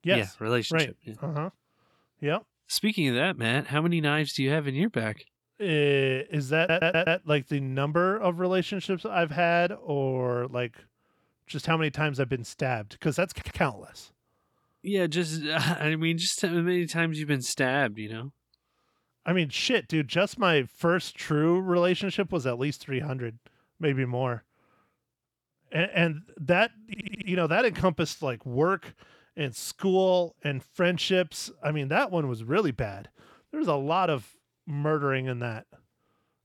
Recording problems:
audio stuttering; at 6.5 s, at 13 s and at 27 s

